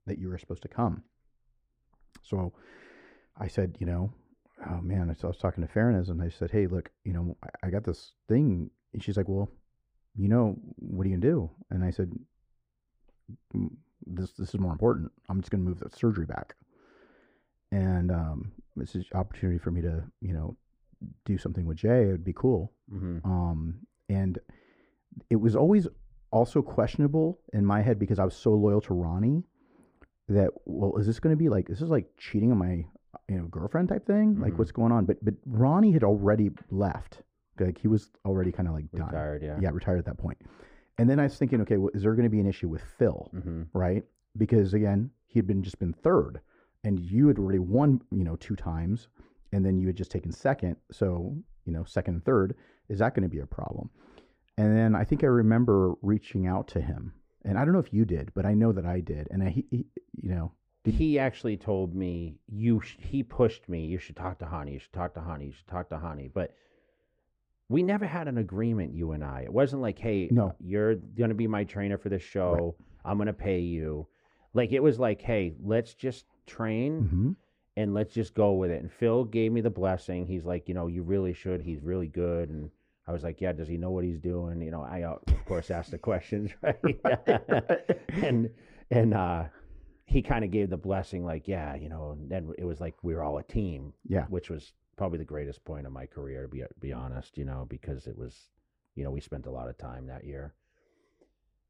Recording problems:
muffled; very; fading above 2 kHz

